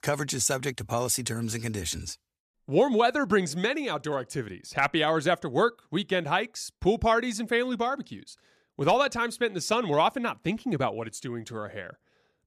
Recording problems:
none

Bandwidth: 14.5 kHz